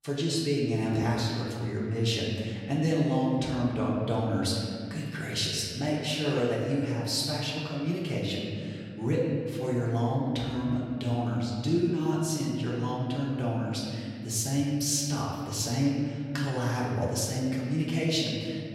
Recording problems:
off-mic speech; far
room echo; noticeable; dies away in 2.1 s

